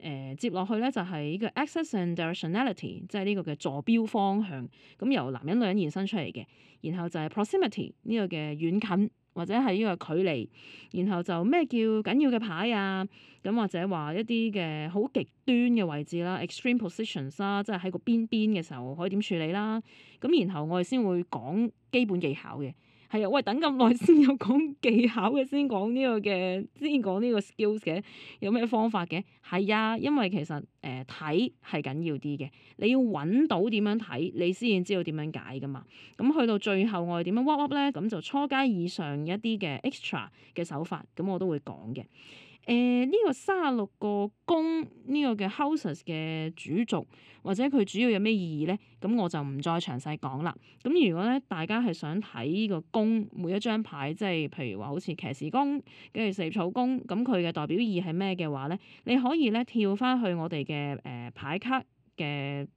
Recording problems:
muffled; slightly; fading above 2.5 kHz

